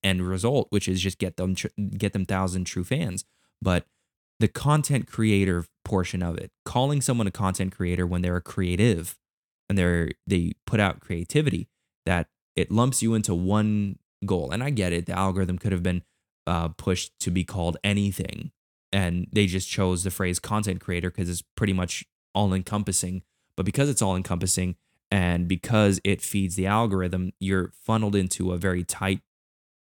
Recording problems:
none

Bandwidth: 17.5 kHz